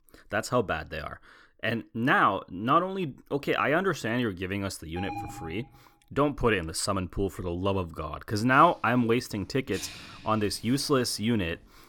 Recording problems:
household noises; faint; from 9 s on; 20 dB below the speech
alarm; noticeable; at 5 s; peak 10 dB below the speech

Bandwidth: 18.5 kHz